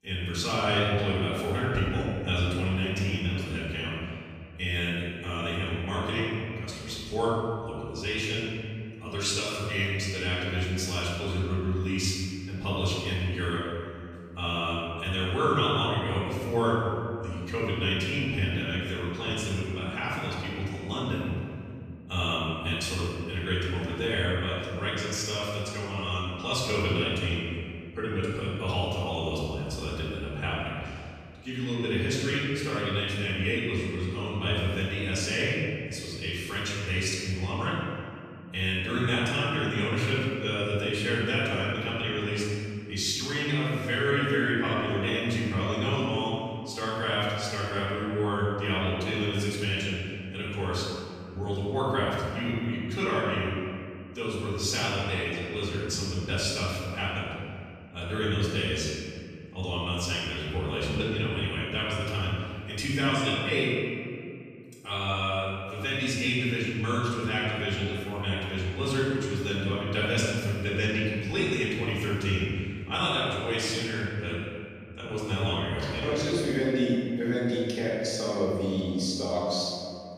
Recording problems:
room echo; strong; dies away in 2.1 s
off-mic speech; far

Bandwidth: 14.5 kHz